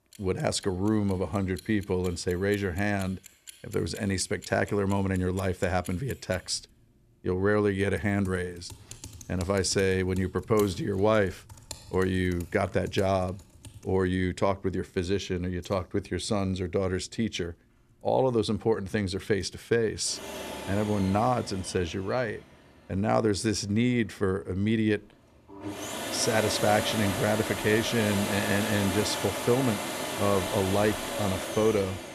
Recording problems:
household noises; loud; throughout; 6 dB below the speech

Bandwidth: 14 kHz